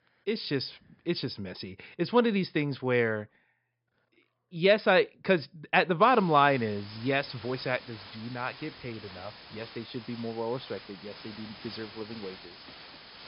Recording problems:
high frequencies cut off; noticeable; nothing above 5.5 kHz
hiss; noticeable; from 6 s on; 20 dB below the speech

